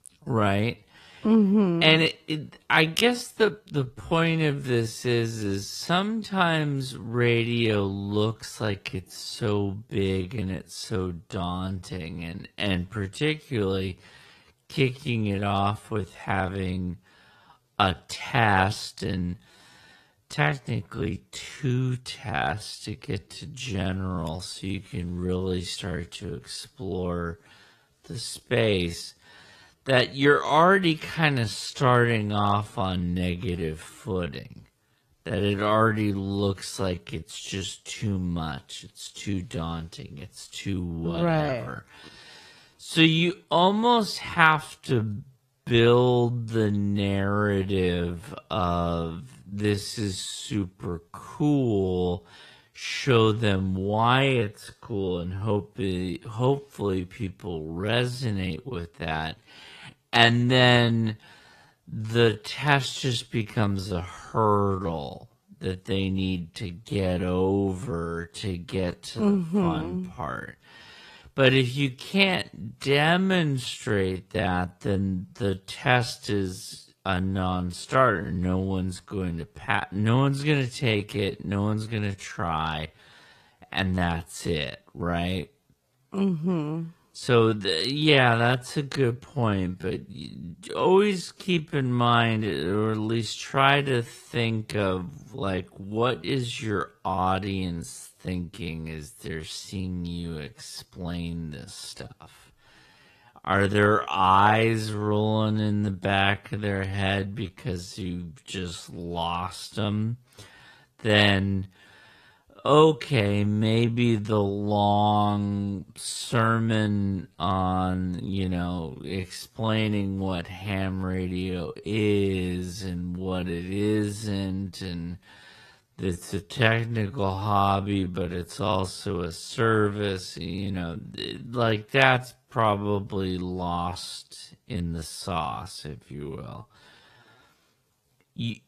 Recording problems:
wrong speed, natural pitch; too slow; 0.5 times normal speed
garbled, watery; slightly; nothing above 14.5 kHz

